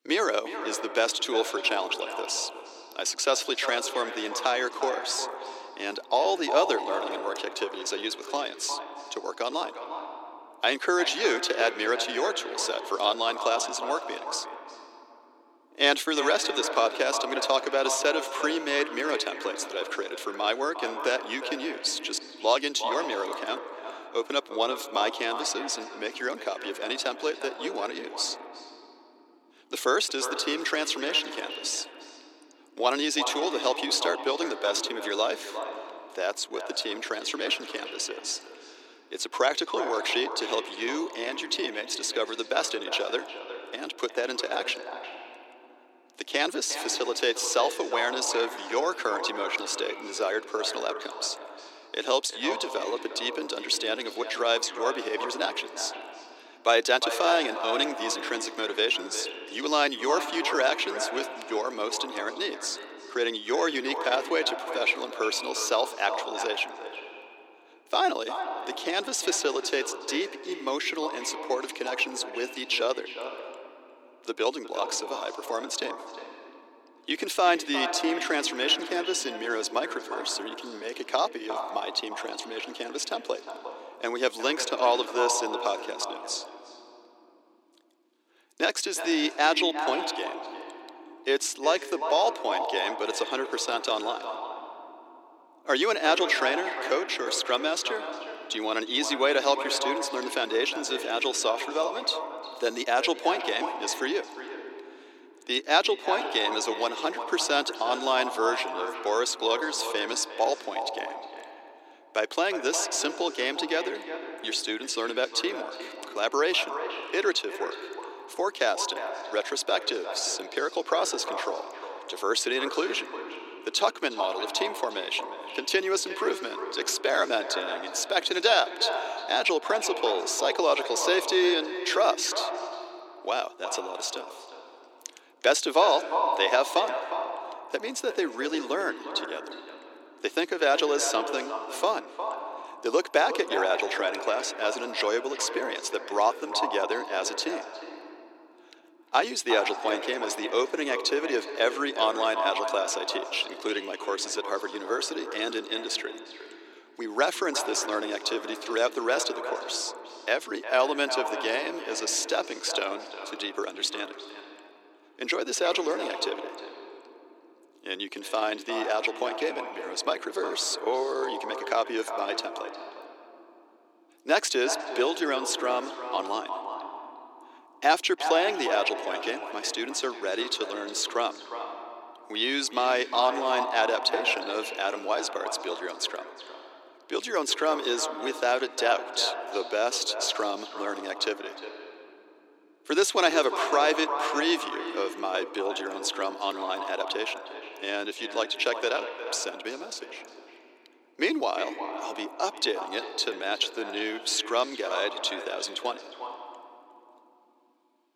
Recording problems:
echo of what is said; strong; throughout; 360 ms later, 8 dB below the speech
thin; somewhat; fading below 350 Hz

